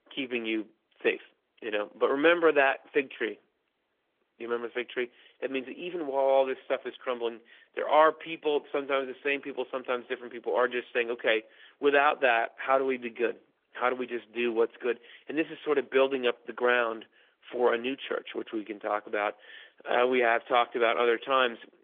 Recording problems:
phone-call audio; nothing above 3.5 kHz
garbled, watery; slightly

